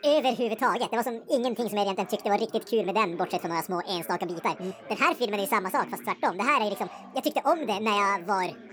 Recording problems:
wrong speed and pitch; too fast and too high; 1.6 times normal speed
background chatter; noticeable; throughout; 4 voices, 20 dB below the speech

